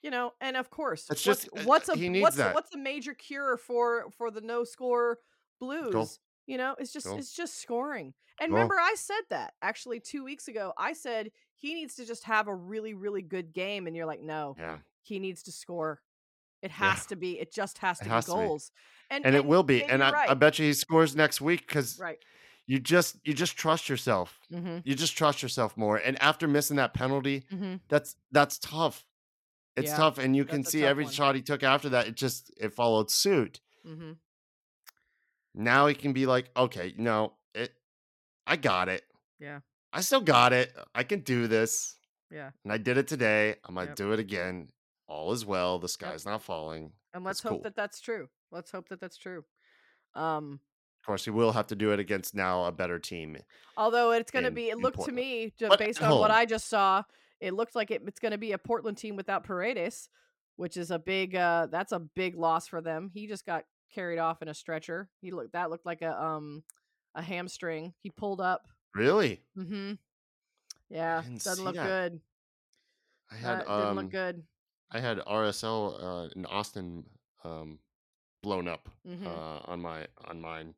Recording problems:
none

